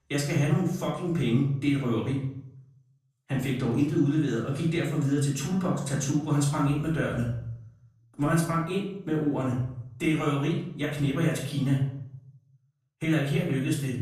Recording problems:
off-mic speech; far
room echo; noticeable; dies away in 0.6 s

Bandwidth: 14.5 kHz